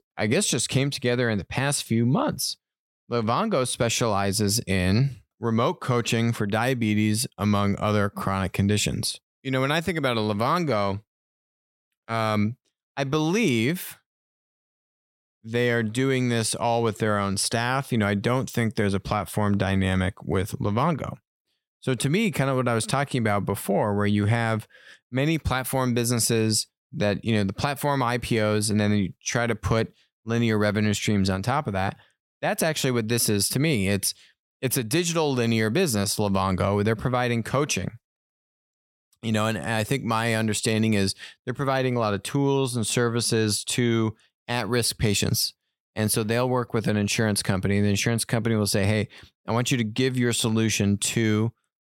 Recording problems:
none

